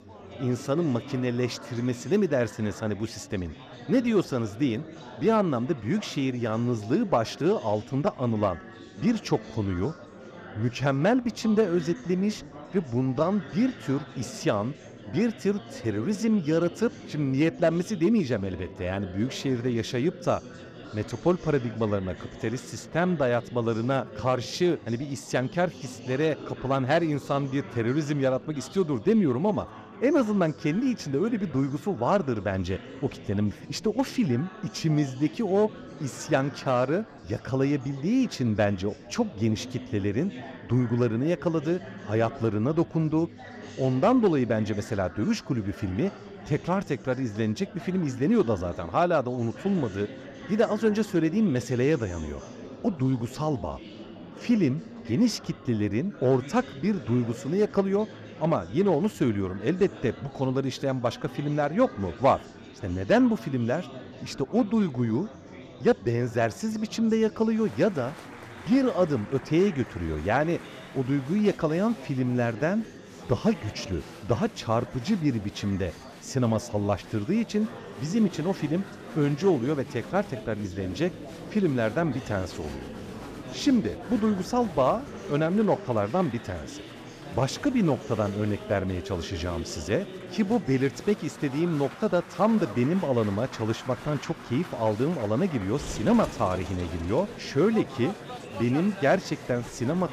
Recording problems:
chatter from many people; noticeable; throughout; 15 dB below the speech

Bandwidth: 14.5 kHz